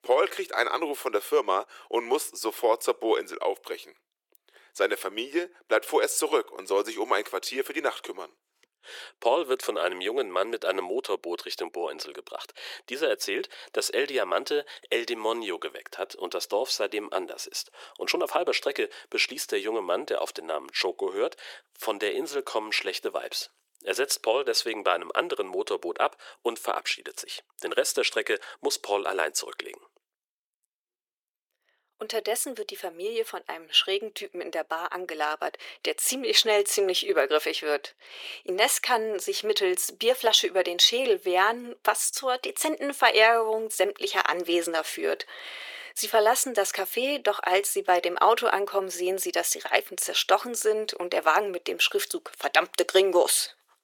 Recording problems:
thin; very; fading below 350 Hz

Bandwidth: 18 kHz